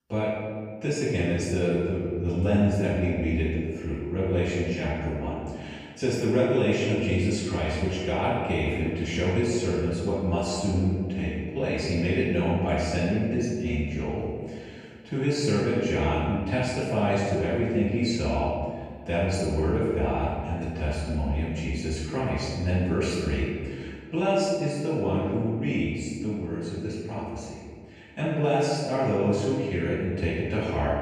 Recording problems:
room echo; strong; dies away in 1.7 s
off-mic speech; far

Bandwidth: 15.5 kHz